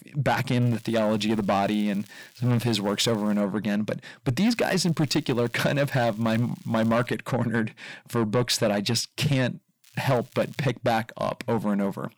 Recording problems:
distortion; slight; 10 dB below the speech
crackling; faint; from 0.5 to 3.5 s, from 4.5 to 7 s and at 10 s; 25 dB below the speech

